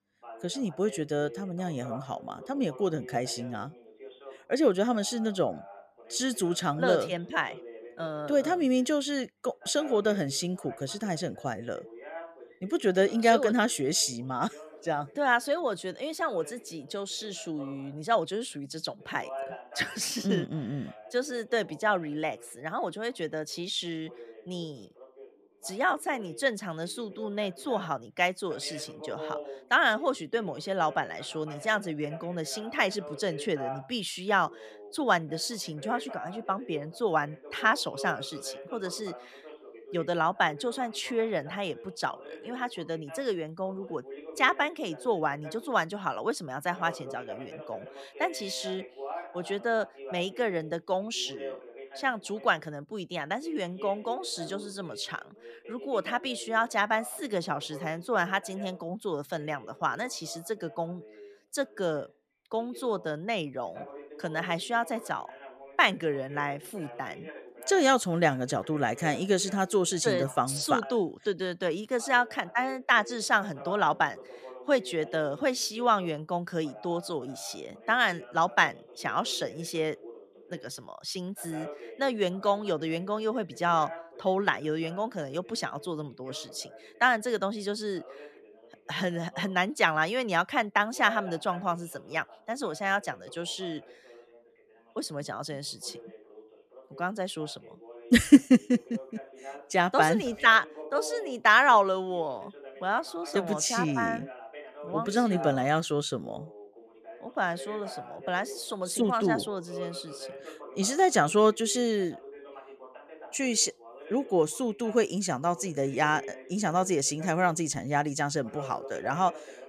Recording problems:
voice in the background; noticeable; throughout; 15 dB below the speech

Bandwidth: 14.5 kHz